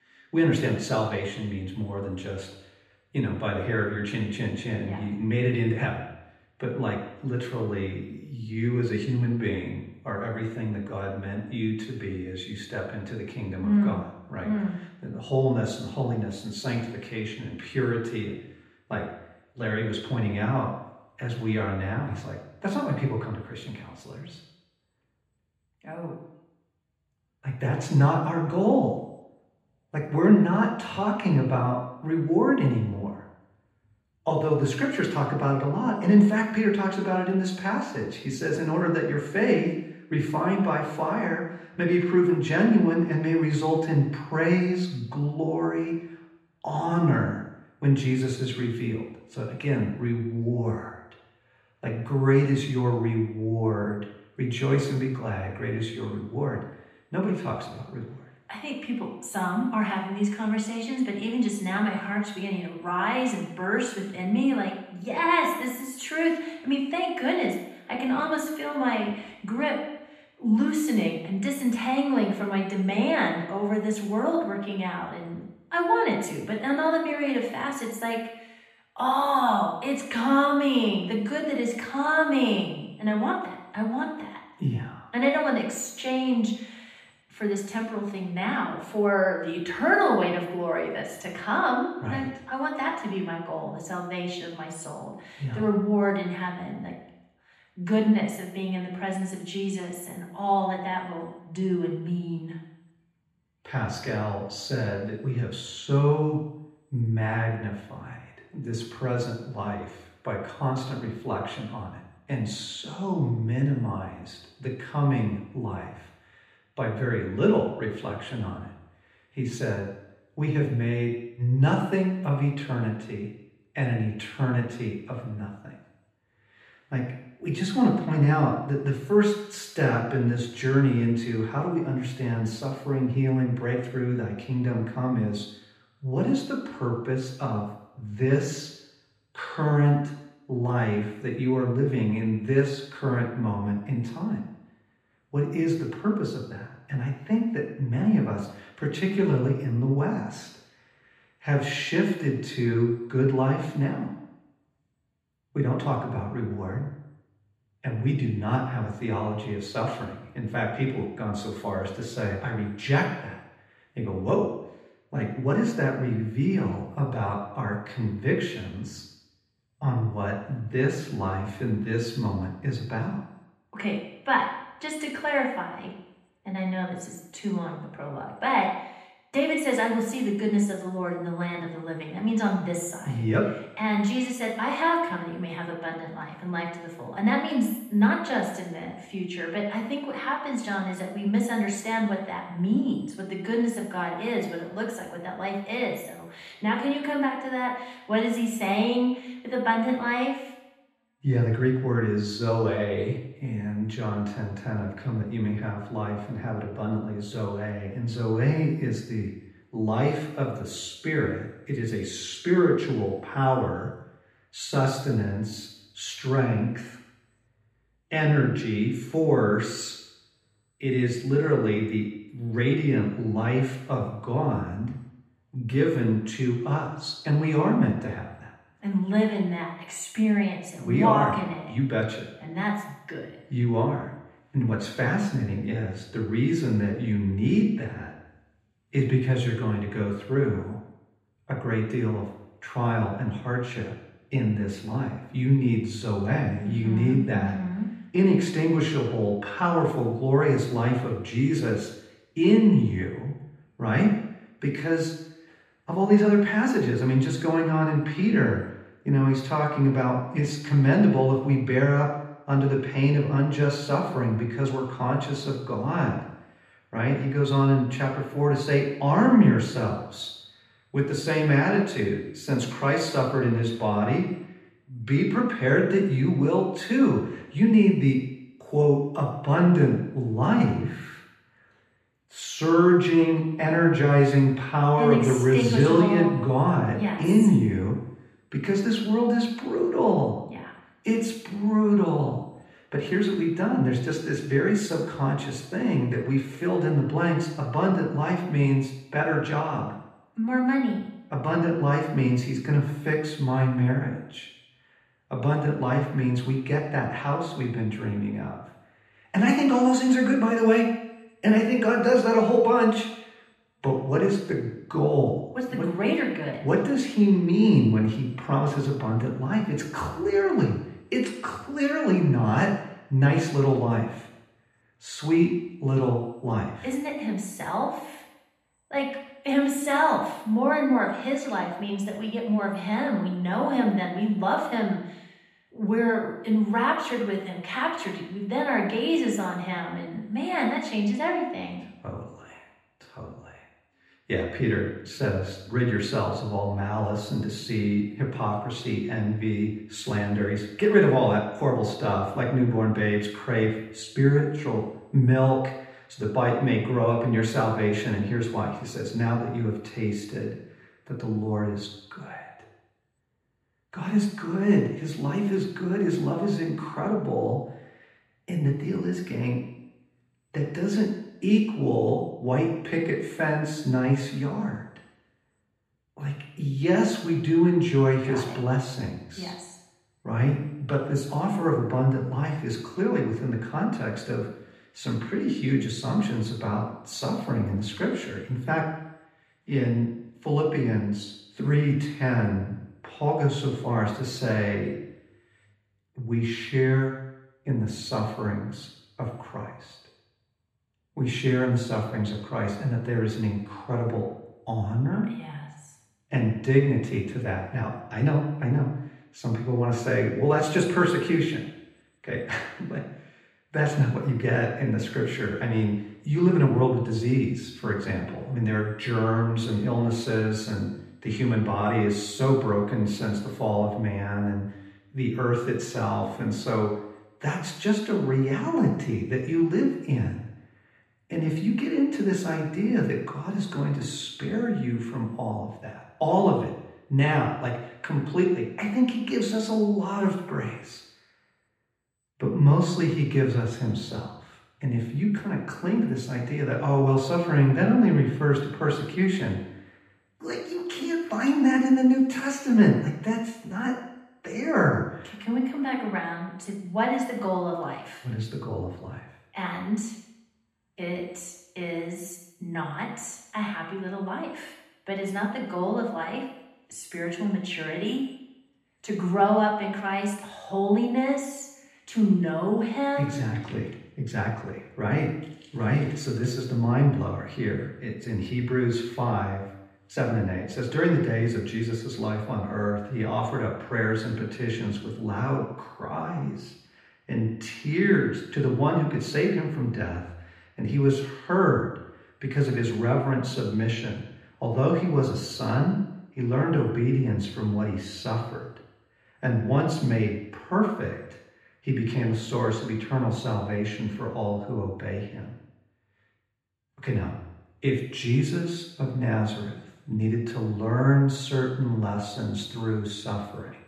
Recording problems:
off-mic speech; far
room echo; noticeable; dies away in 0.9 s

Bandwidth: 14.5 kHz